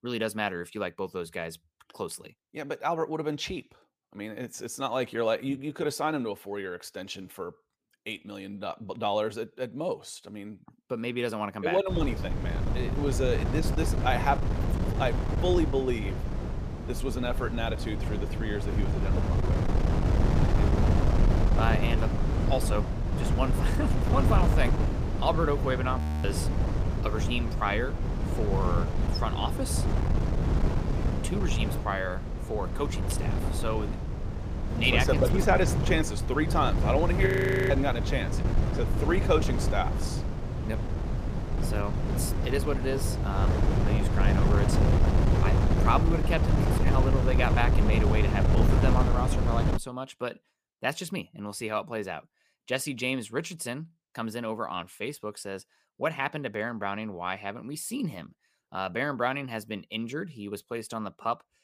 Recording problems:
wind noise on the microphone; heavy; from 12 to 50 s; 4 dB below the speech
audio freezing; at 26 s and at 37 s

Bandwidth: 15 kHz